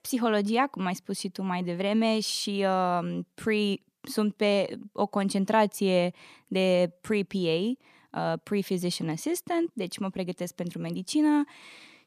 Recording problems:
none

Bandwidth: 14.5 kHz